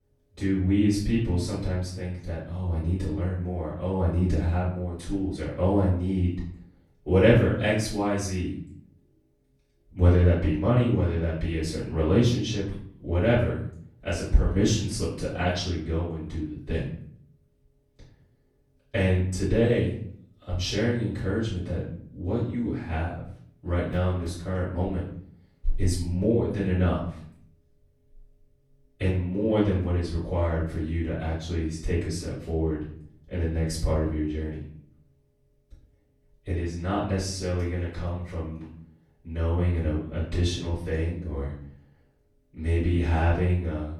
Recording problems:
off-mic speech; far
room echo; noticeable; dies away in 0.6 s

